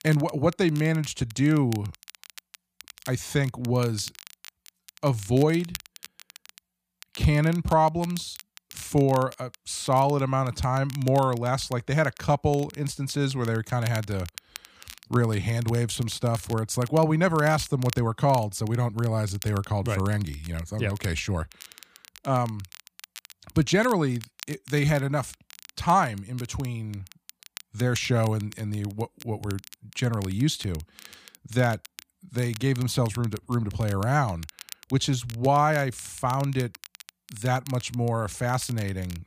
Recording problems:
crackle, like an old record; noticeable; 20 dB below the speech

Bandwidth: 15 kHz